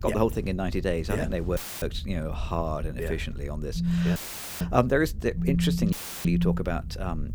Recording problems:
low rumble; faint; throughout; 25 dB below the speech
audio cutting out; filled with static; at 1.5 s, at 4 s and at 6 s
phone ringing; loud; from 4 to 6.5 s; peak 4 dB above the speech

